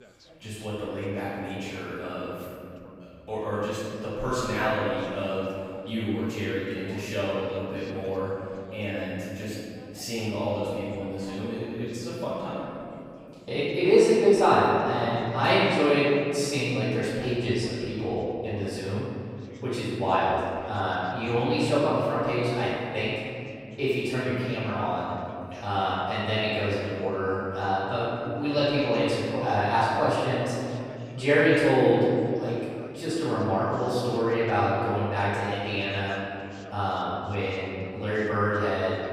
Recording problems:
room echo; strong; dies away in 2.4 s
off-mic speech; far
background chatter; faint; throughout; 2 voices, 25 dB below the speech

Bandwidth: 15.5 kHz